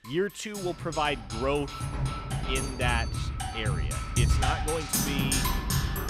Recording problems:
background music; very loud; throughout; 2 dB above the speech

